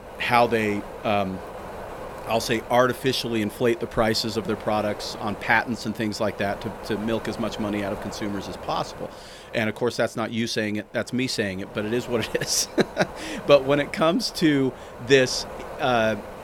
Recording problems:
wind noise on the microphone; occasional gusts; 15 dB below the speech

